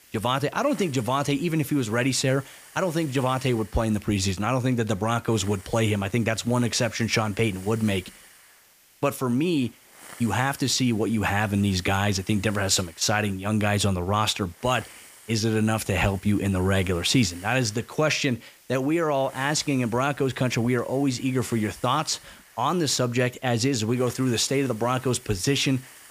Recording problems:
hiss; faint; throughout; 20 dB below the speech

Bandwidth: 15 kHz